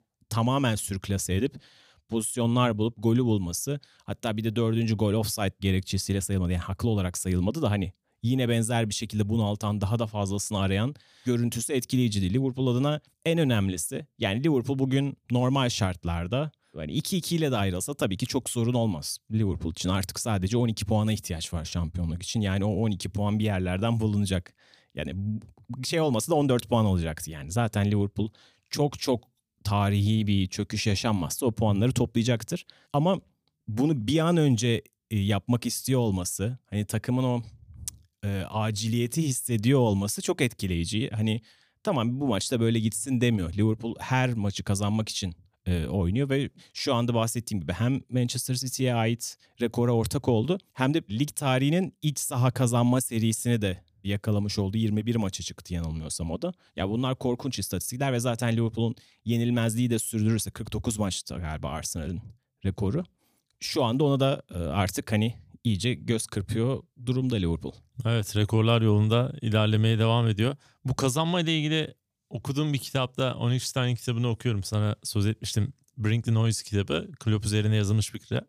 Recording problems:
none

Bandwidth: 15 kHz